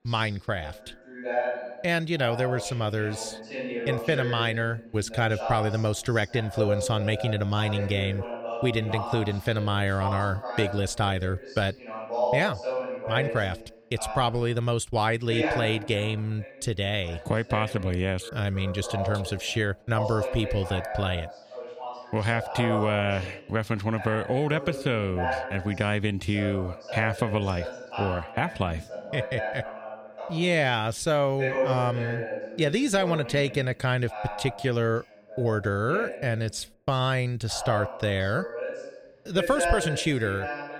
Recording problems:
voice in the background; loud; throughout; 6 dB below the speech

